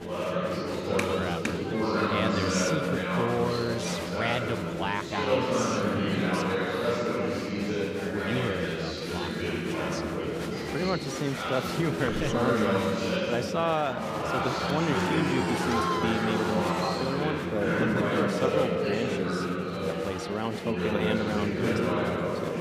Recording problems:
chatter from many people; very loud; throughout; 4 dB above the speech

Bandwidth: 15 kHz